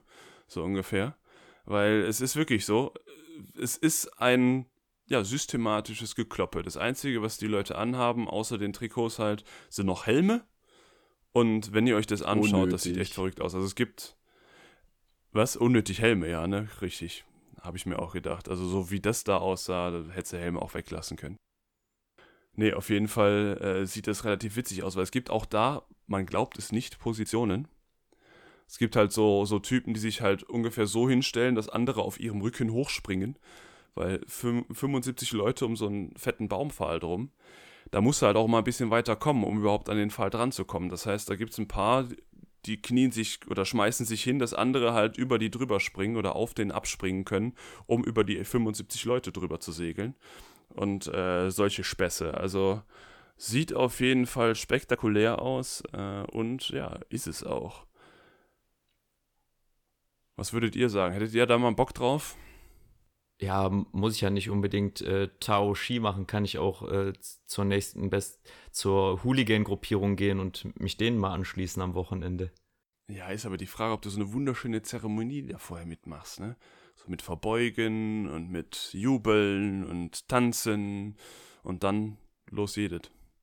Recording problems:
uneven, jittery; slightly; from 27 s to 1:22

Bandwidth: 18.5 kHz